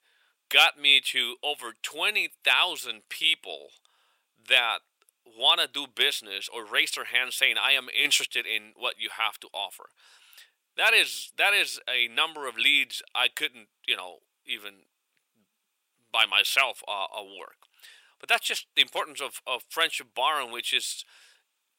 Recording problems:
thin; very; fading below 900 Hz

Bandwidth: 16.5 kHz